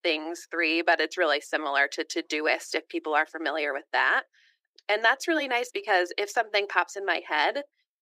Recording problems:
thin; very; fading below 350 Hz

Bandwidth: 15.5 kHz